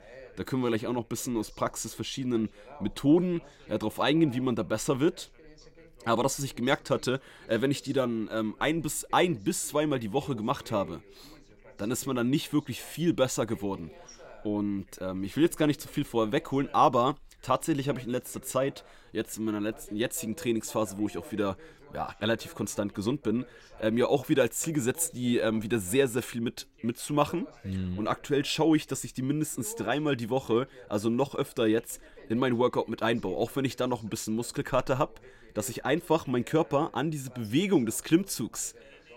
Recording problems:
background chatter; faint; throughout; 2 voices, 25 dB below the speech

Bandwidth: 16 kHz